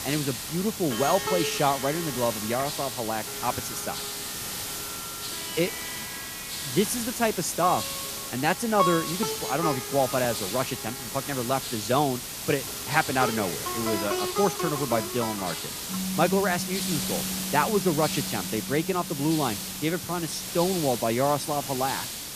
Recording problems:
background music; loud; throughout; 7 dB below the speech
hiss; loud; throughout; 4 dB below the speech

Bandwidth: 14.5 kHz